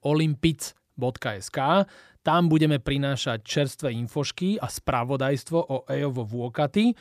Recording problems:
none

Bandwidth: 14.5 kHz